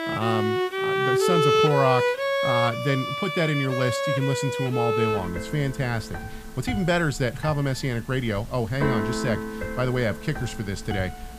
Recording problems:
background music; very loud; throughout; 1 dB above the speech
hiss; faint; throughout; 25 dB below the speech

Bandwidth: 15 kHz